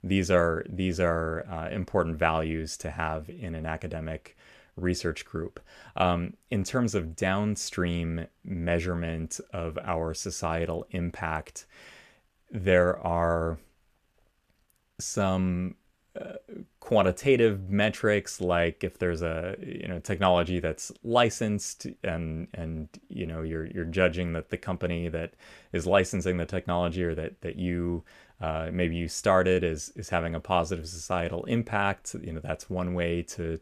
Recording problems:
none

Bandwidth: 14.5 kHz